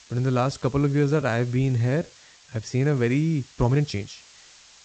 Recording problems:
high frequencies cut off; noticeable; nothing above 8 kHz
hiss; faint; throughout; 25 dB below the speech
uneven, jittery; strongly; until 4 s

